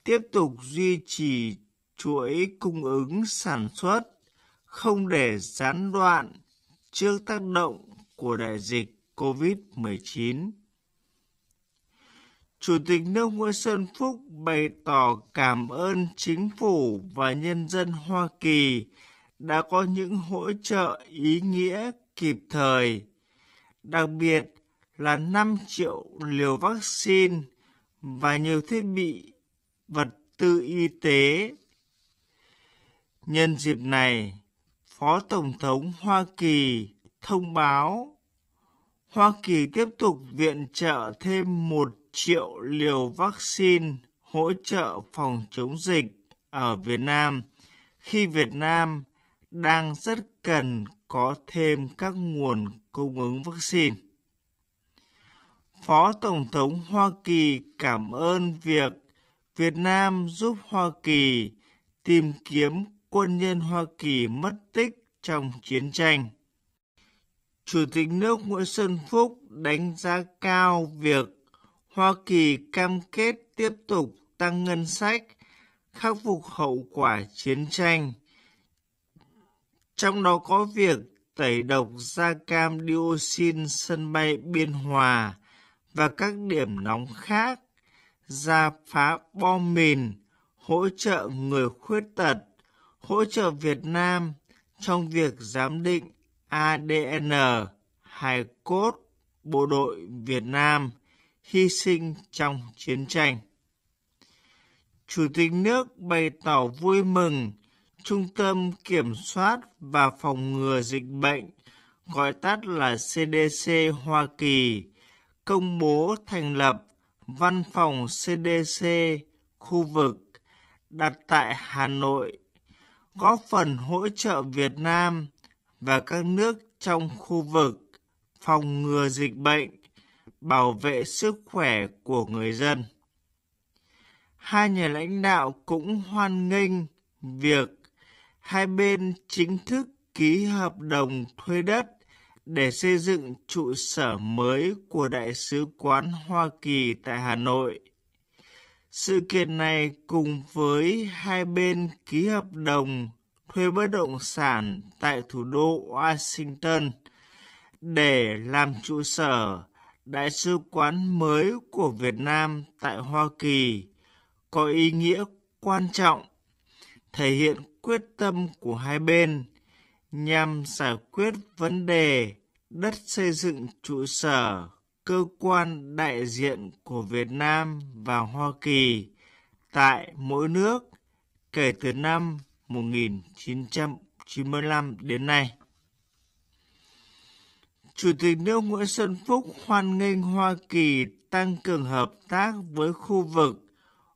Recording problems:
wrong speed, natural pitch; too slow; 0.5 times normal speed

